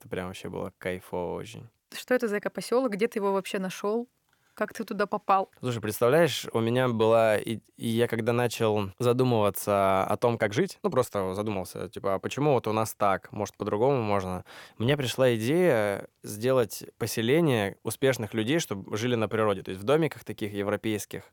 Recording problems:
uneven, jittery; strongly; from 4.5 to 20 s

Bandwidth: 17.5 kHz